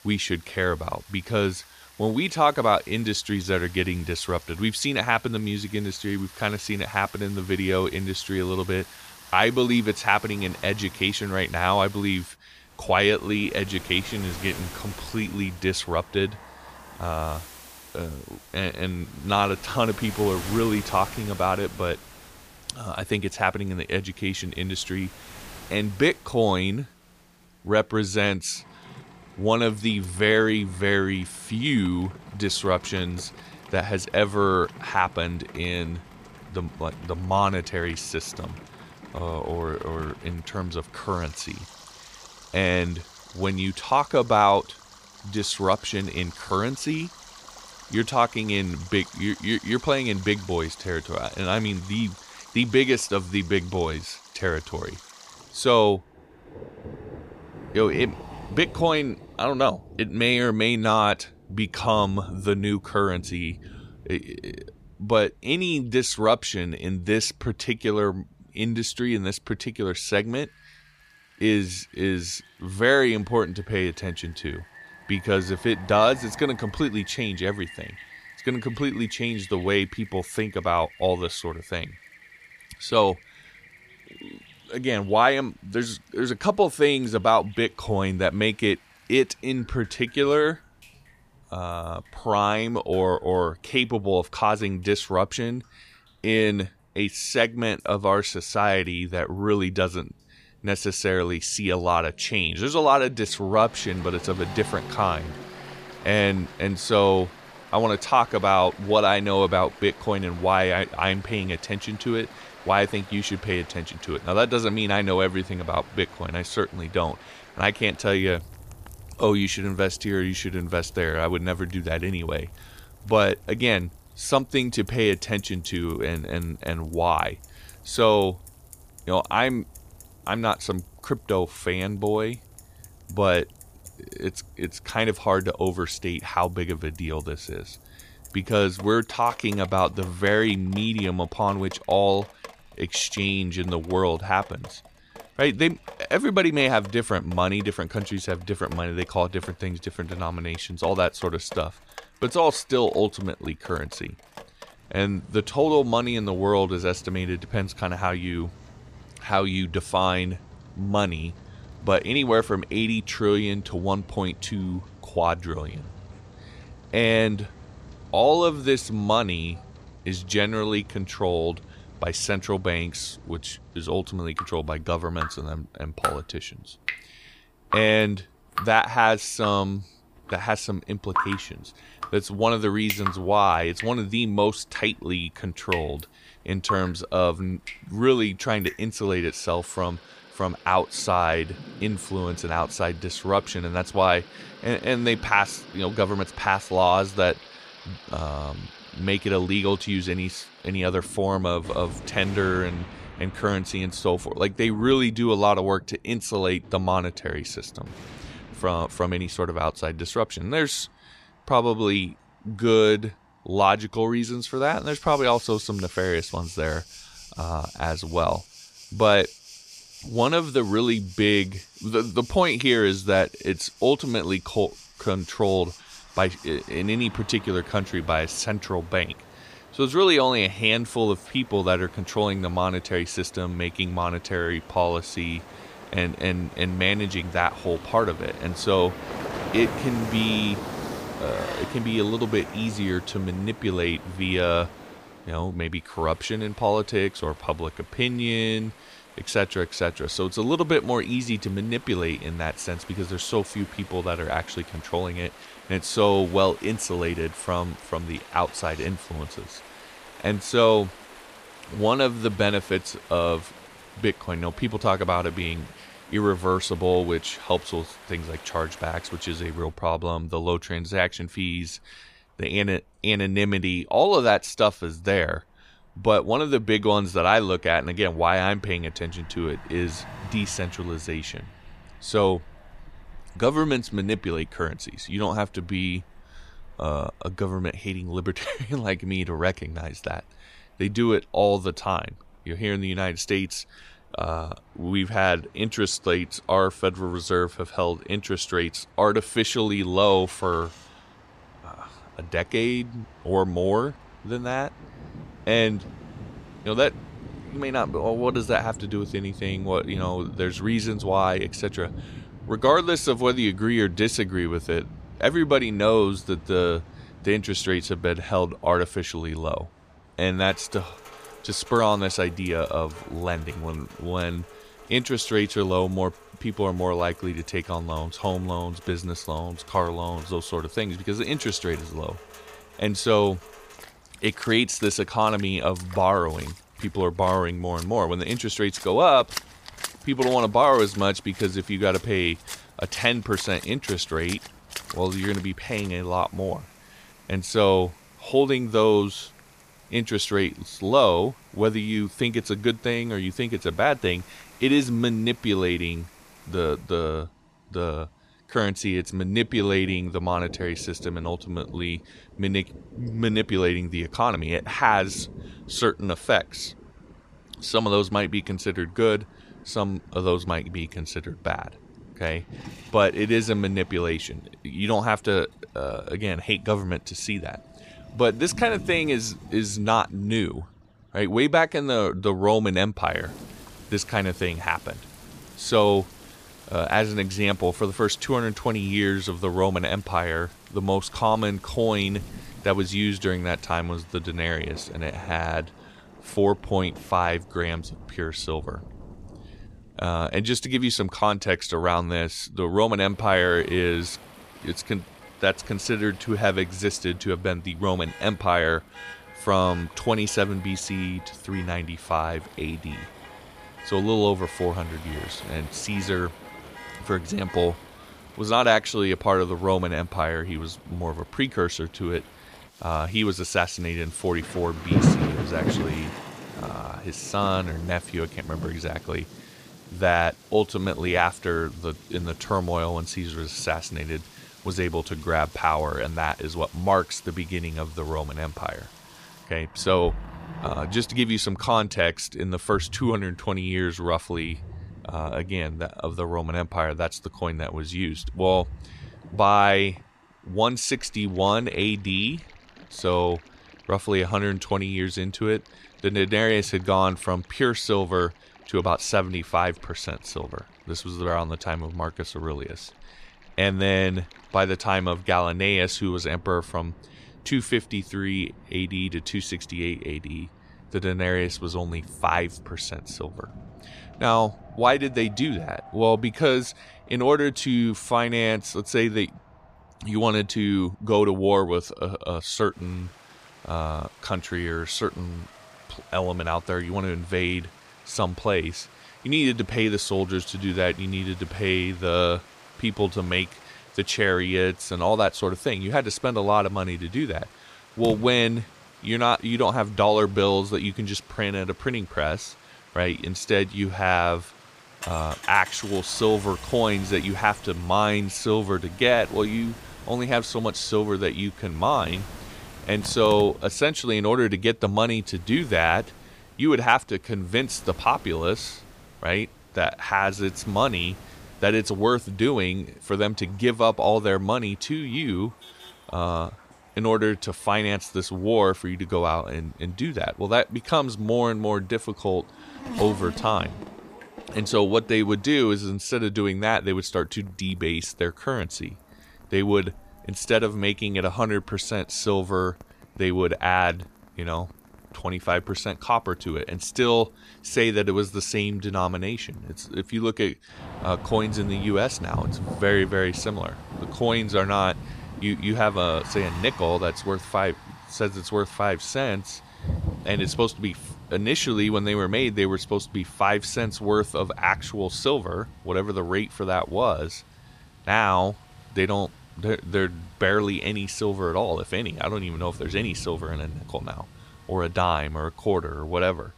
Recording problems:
rain or running water; noticeable; throughout; 15 dB below the speech
traffic noise; faint; throughout; 25 dB below the speech

